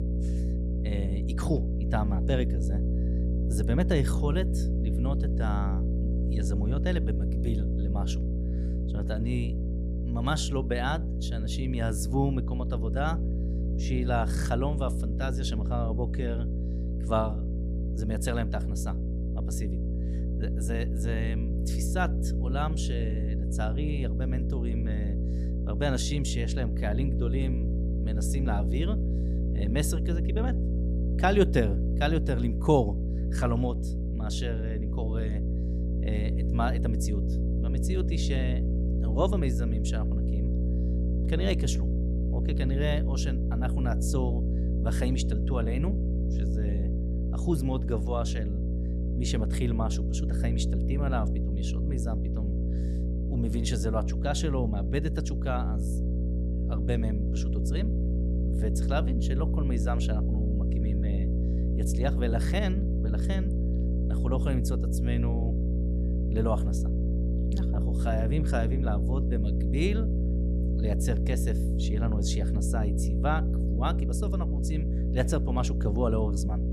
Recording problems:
electrical hum; loud; throughout; 60 Hz, 6 dB below the speech

